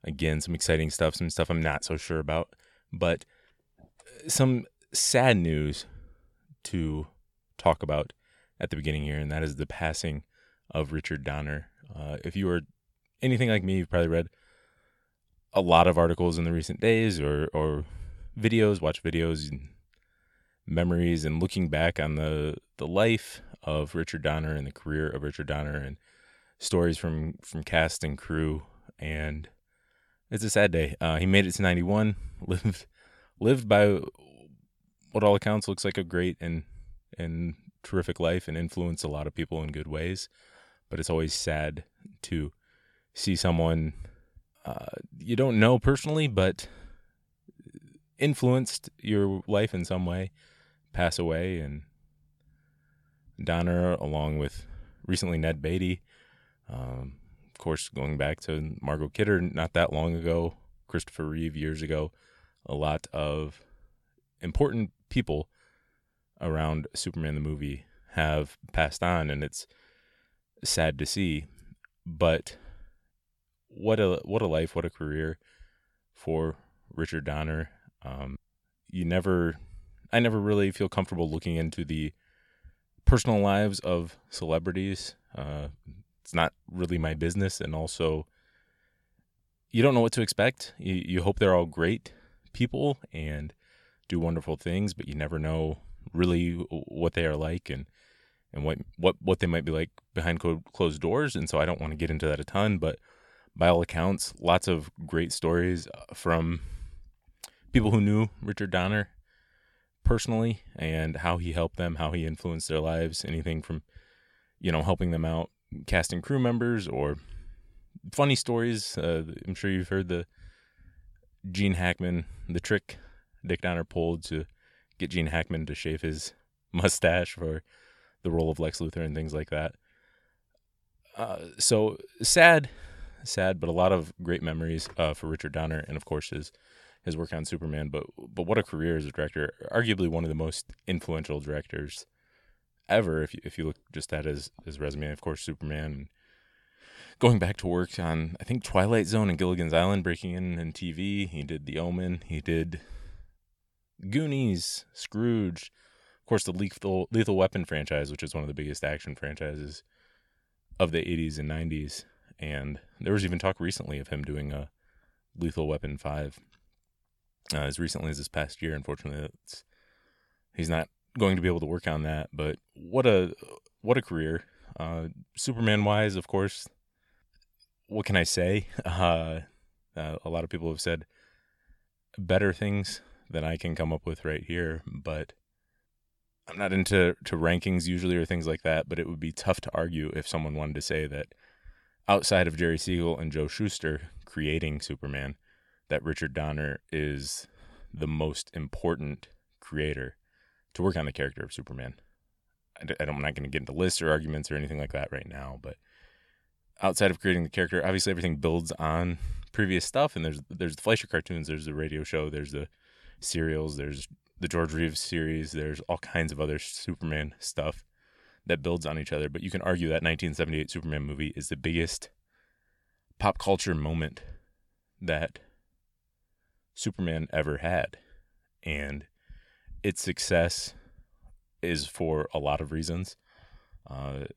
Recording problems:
none

